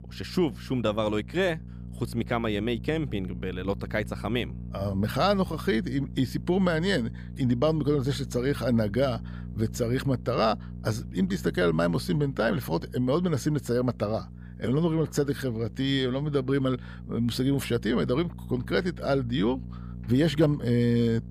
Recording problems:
electrical hum; faint; throughout; 60 Hz, 20 dB below the speech

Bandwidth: 15 kHz